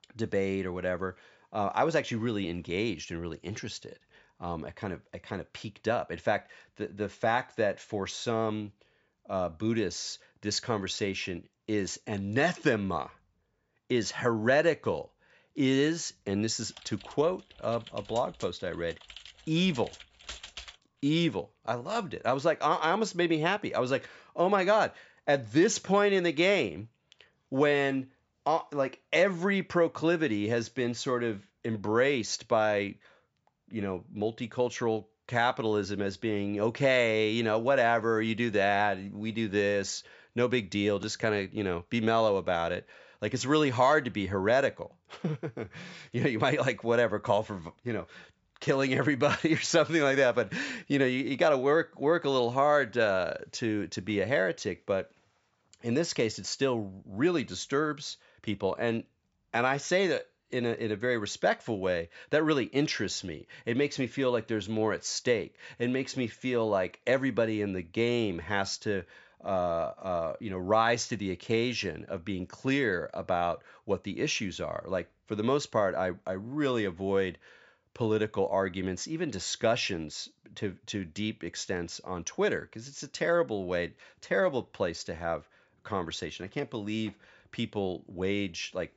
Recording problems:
high frequencies cut off; noticeable; nothing above 8 kHz
keyboard typing; faint; from 17 to 21 s; peak 10 dB below the speech

